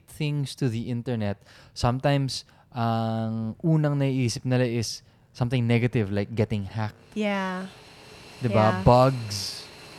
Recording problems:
train or aircraft noise; noticeable; throughout; 20 dB below the speech

